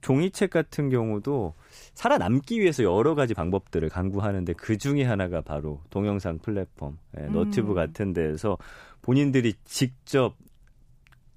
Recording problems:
uneven, jittery; strongly; from 2 to 9 s

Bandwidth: 15 kHz